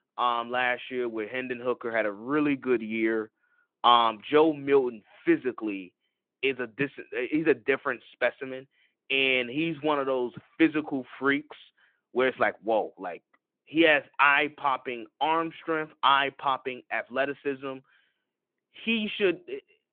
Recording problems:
phone-call audio; nothing above 3.5 kHz

